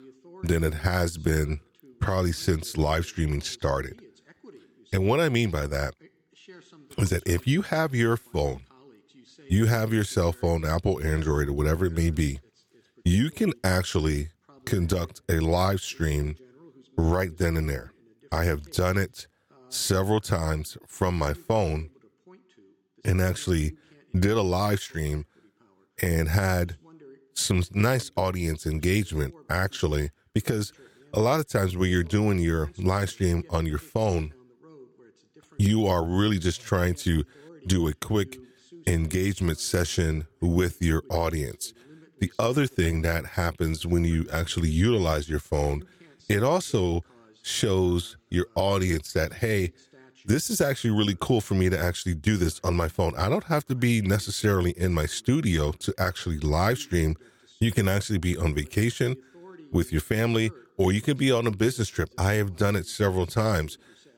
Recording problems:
voice in the background; faint; throughout; 30 dB below the speech

